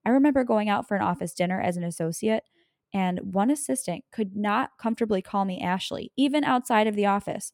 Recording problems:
none

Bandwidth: 17 kHz